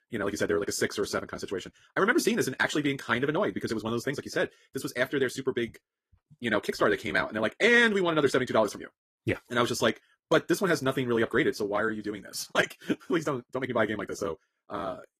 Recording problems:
wrong speed, natural pitch; too fast; 1.7 times normal speed
garbled, watery; slightly; nothing above 14.5 kHz

